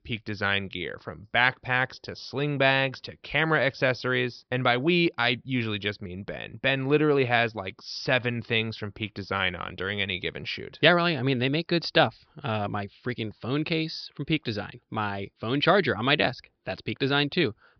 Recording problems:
high frequencies cut off; noticeable; nothing above 5.5 kHz

